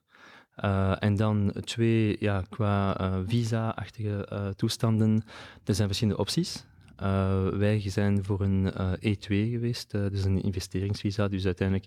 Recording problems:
none

